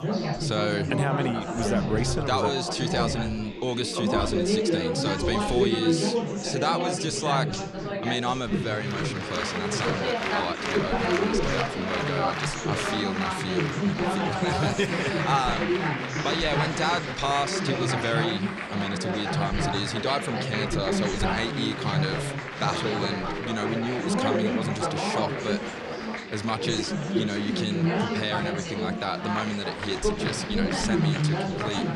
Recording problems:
chatter from many people; very loud; throughout; 2 dB above the speech

